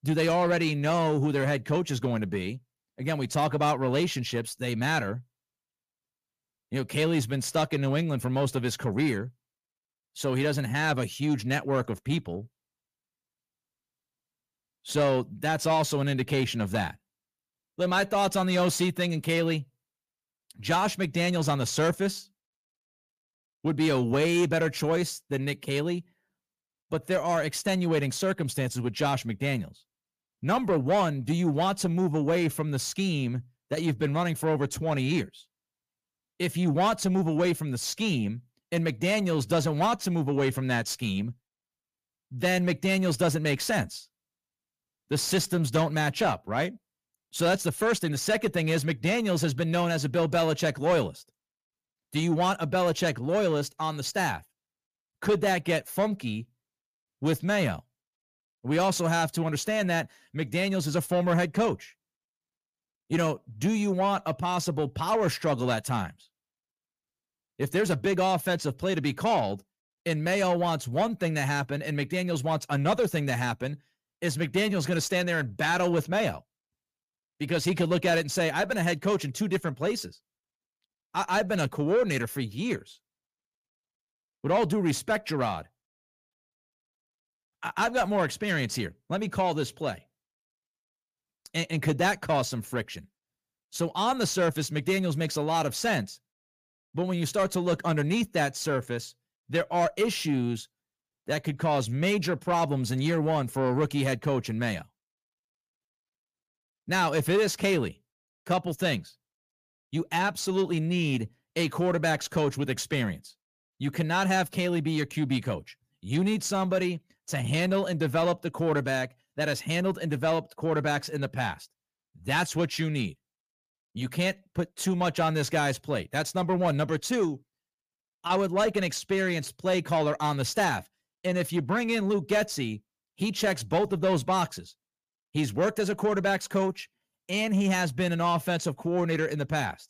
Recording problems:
distortion; slight; 10 dB below the speech

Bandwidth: 15 kHz